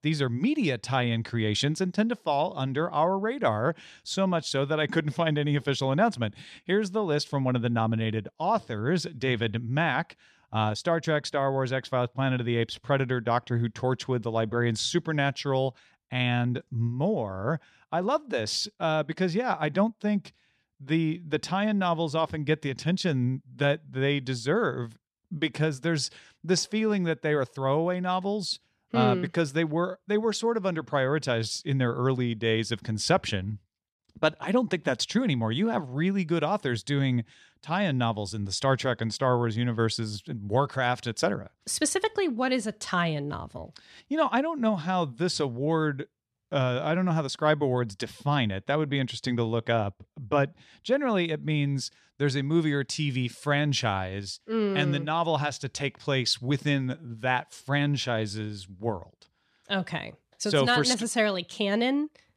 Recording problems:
none

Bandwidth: 13.5 kHz